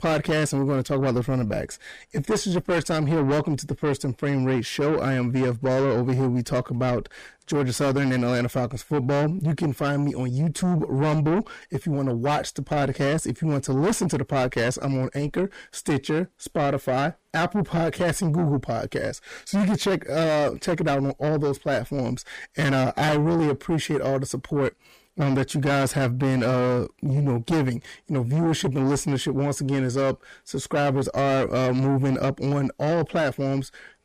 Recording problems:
distortion; heavy; 7 dB below the speech

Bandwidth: 15 kHz